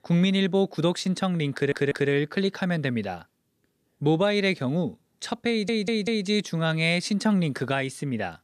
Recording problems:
audio stuttering; at 1.5 s and at 5.5 s

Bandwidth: 14.5 kHz